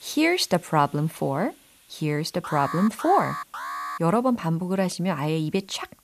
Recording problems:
hiss; faint; throughout; 30 dB below the speech
alarm; noticeable; from 2.5 to 4 s; peak 7 dB below the speech

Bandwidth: 14.5 kHz